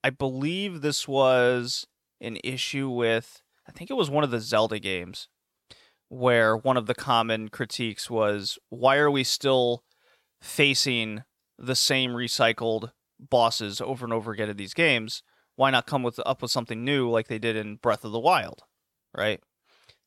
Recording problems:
none

